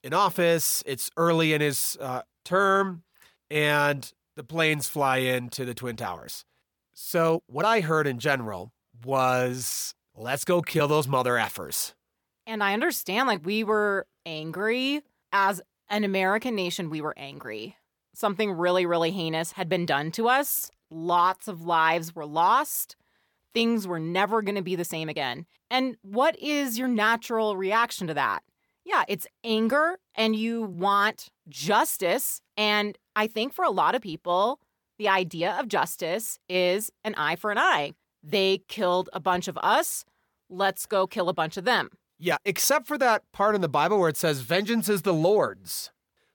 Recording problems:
uneven, jittery; strongly; from 2 to 46 s

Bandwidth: 18 kHz